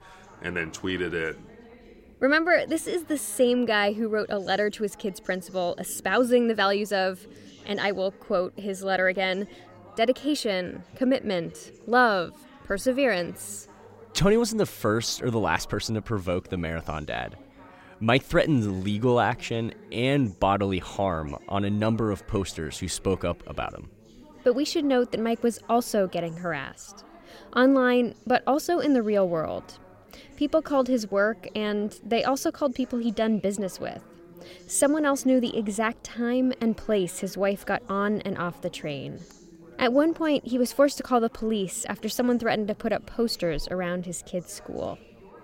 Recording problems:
background chatter; faint; throughout; 3 voices, 25 dB below the speech

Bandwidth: 16 kHz